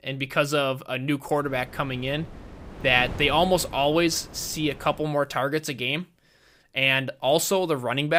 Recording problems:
wind noise on the microphone; occasional gusts; from 1.5 to 5 s; 20 dB below the speech
abrupt cut into speech; at the end

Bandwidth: 15.5 kHz